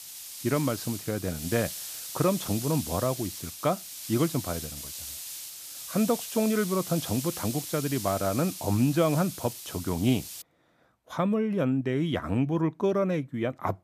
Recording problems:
hiss; loud; until 10 s; 8 dB below the speech

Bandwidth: 14.5 kHz